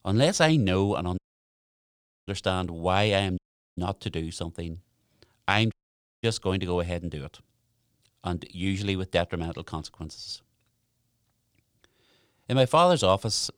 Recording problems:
audio cutting out; at 1 s for 1 s, at 3.5 s and at 5.5 s for 0.5 s

